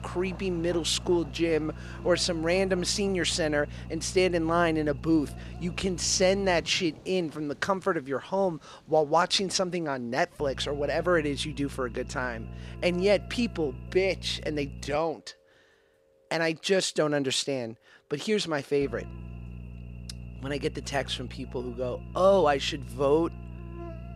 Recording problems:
electrical hum; faint; until 6.5 s, from 10 to 15 s and from 19 s on; 60 Hz, 25 dB below the speech
rain or running water; faint; throughout; 25 dB below the speech

